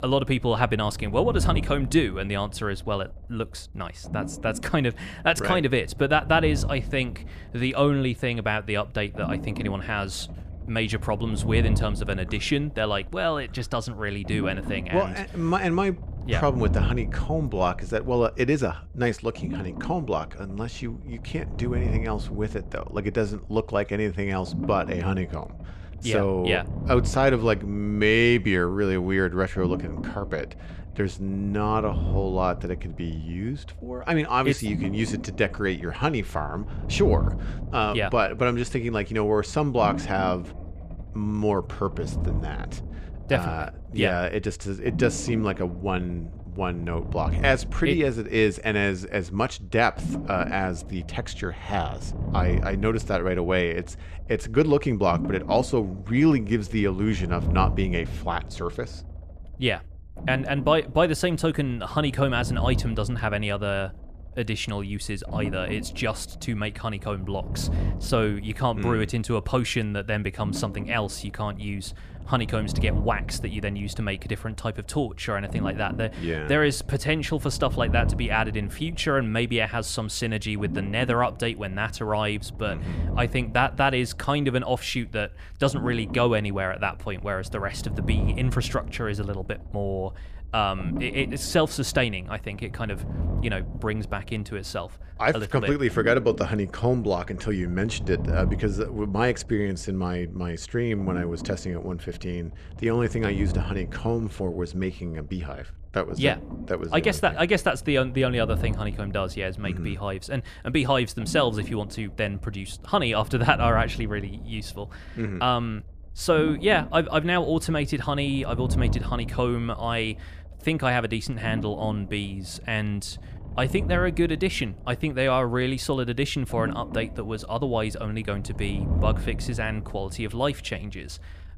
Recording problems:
low rumble; noticeable; throughout; 15 dB below the speech

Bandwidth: 14.5 kHz